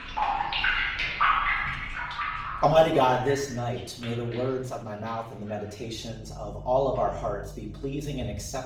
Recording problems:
off-mic speech; far
room echo; noticeable; dies away in 0.5 s
garbled, watery; slightly; nothing above 17.5 kHz
household noises; loud; throughout; as loud as the speech

